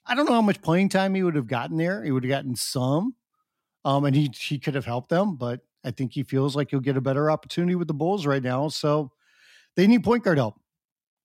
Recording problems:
none

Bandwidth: 16 kHz